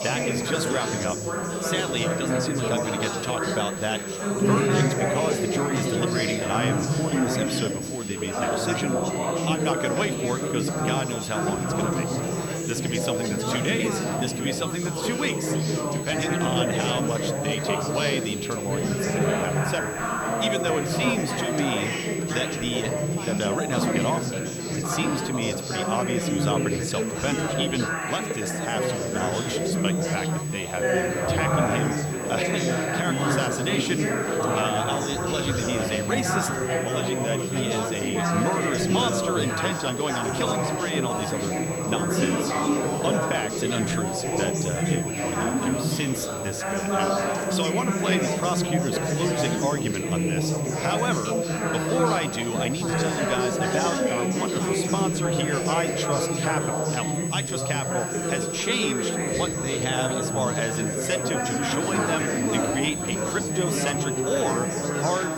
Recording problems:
chatter from many people; very loud; throughout; 3 dB above the speech
high-pitched whine; loud; throughout; 8 kHz, 5 dB below the speech
hiss; noticeable; throughout; 15 dB below the speech

